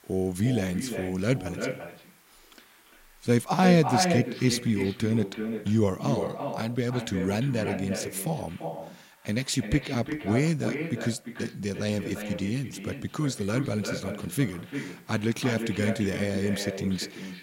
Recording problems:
echo of what is said; strong; throughout; 340 ms later, 6 dB below the speech
hiss; faint; throughout; 30 dB below the speech

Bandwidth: 16 kHz